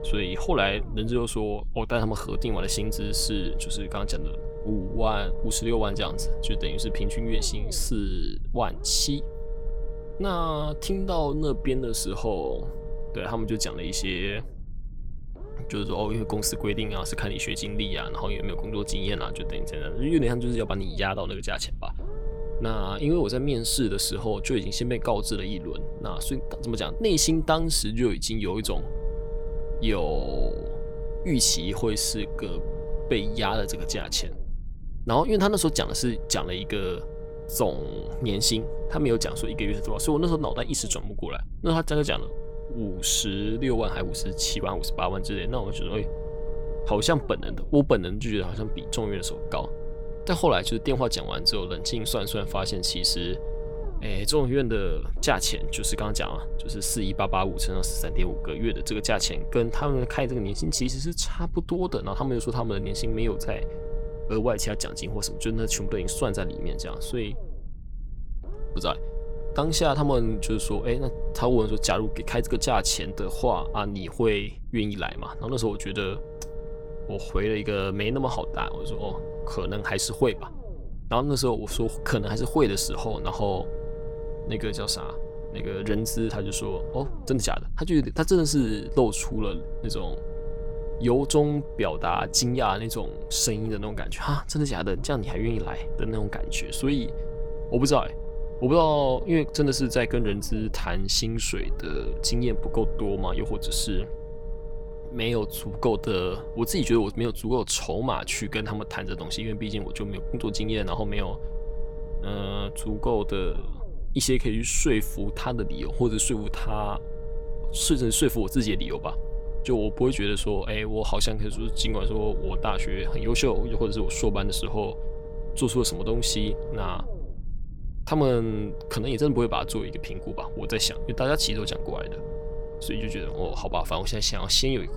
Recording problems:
low rumble; noticeable; throughout; 10 dB below the speech

